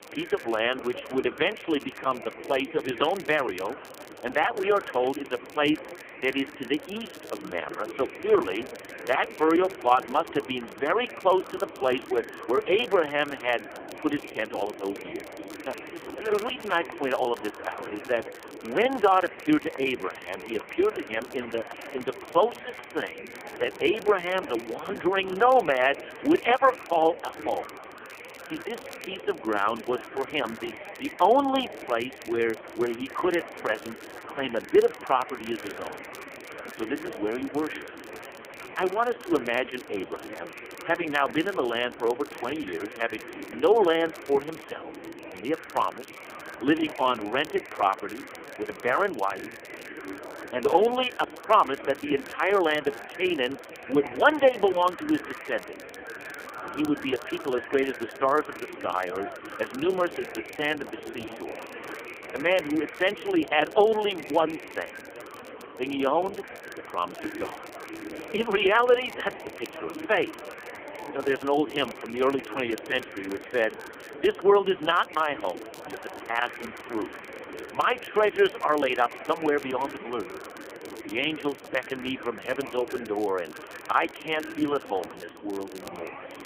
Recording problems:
phone-call audio; poor line; nothing above 3.5 kHz
murmuring crowd; noticeable; throughout; 15 dB below the speech
crackle, like an old record; faint; 25 dB below the speech

